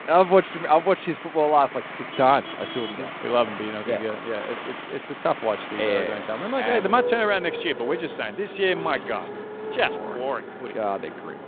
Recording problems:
phone-call audio
traffic noise; loud; throughout; 10 dB below the speech

